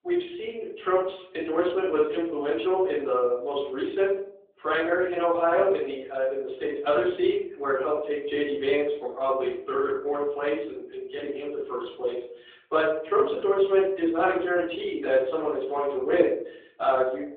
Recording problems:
off-mic speech; far
room echo; noticeable; dies away in 0.5 s
phone-call audio

